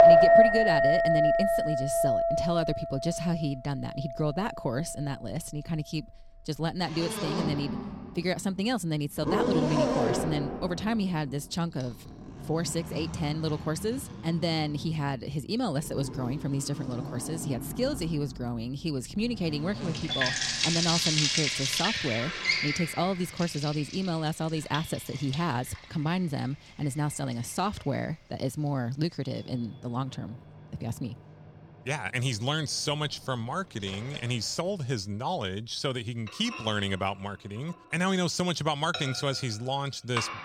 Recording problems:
household noises; very loud; throughout; 3 dB above the speech

